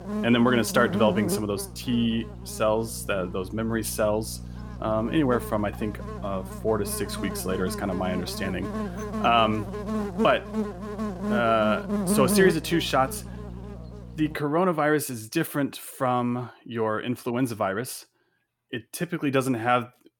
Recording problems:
electrical hum; loud; until 14 s; 60 Hz, 9 dB below the speech

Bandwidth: 18 kHz